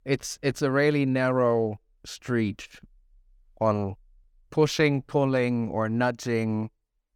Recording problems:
none

